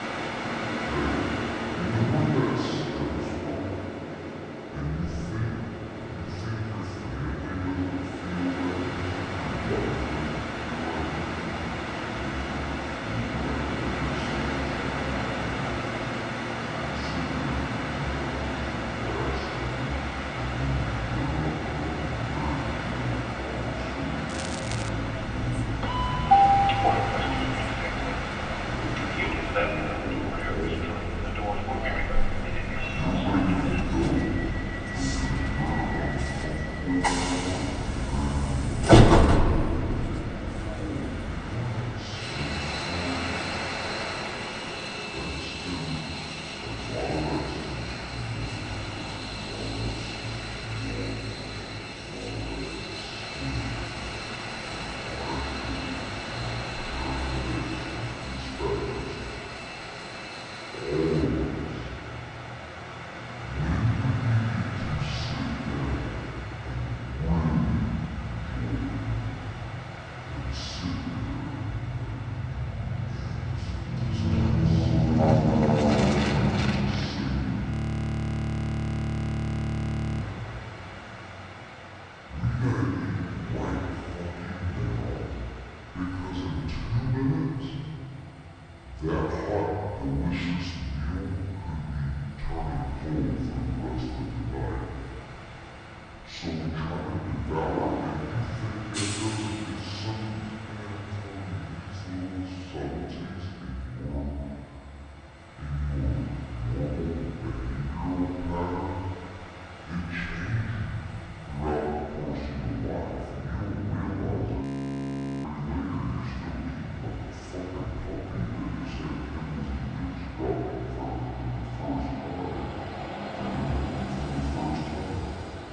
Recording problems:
off-mic speech; far
wrong speed and pitch; too slow and too low; 0.6 times normal speed
room echo; noticeable; dies away in 1.9 s
train or aircraft noise; very loud; throughout; 2 dB above the speech
crackling; loud; at 24 s; 7 dB below the speech
audio freezing; at 1:18 for 2.5 s and at 1:55 for 1 s

